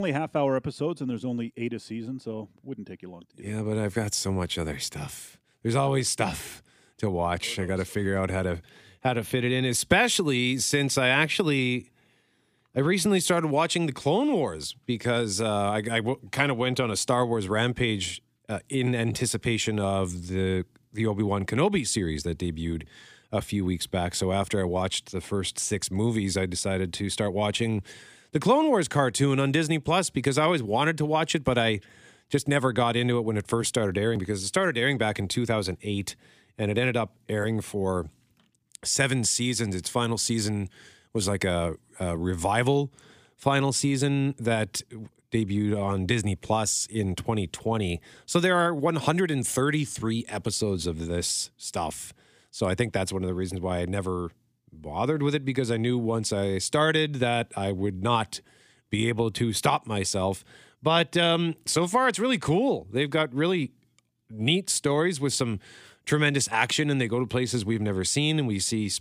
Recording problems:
abrupt cut into speech; at the start

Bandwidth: 15 kHz